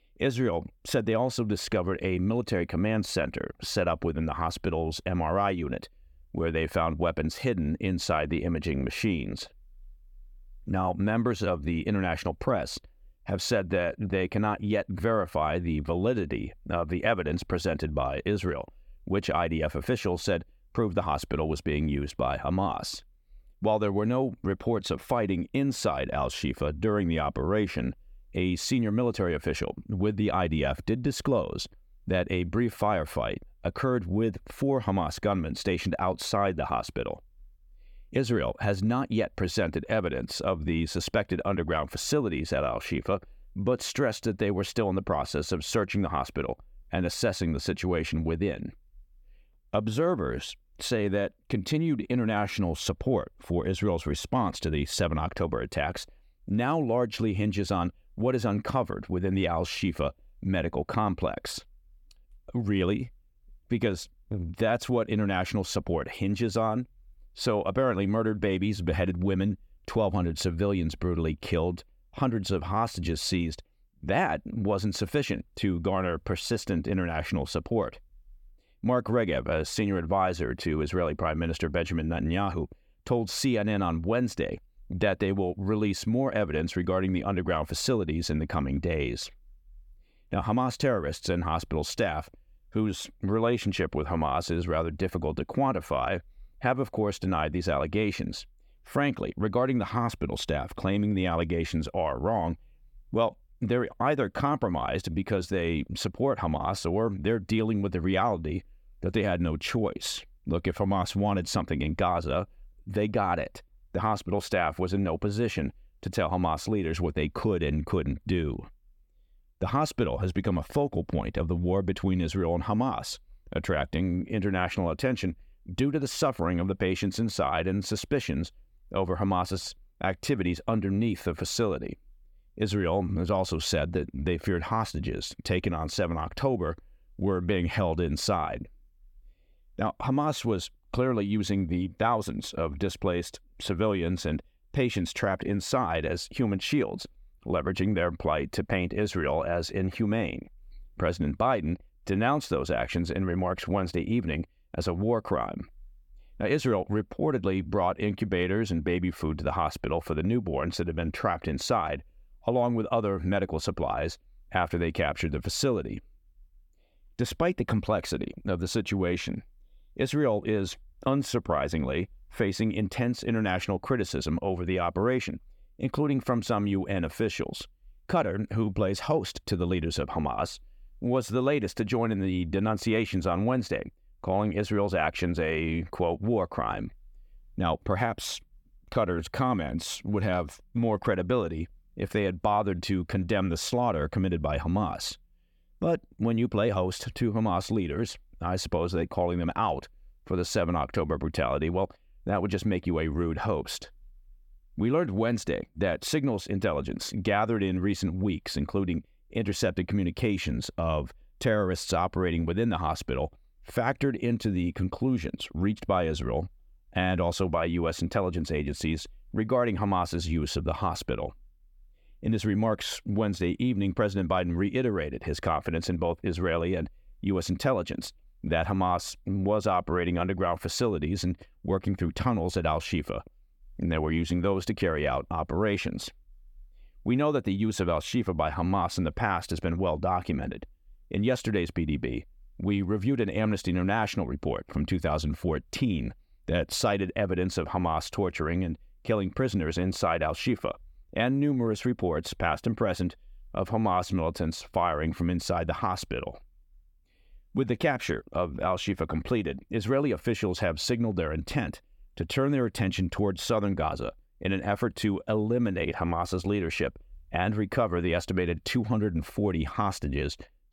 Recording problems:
none

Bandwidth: 17.5 kHz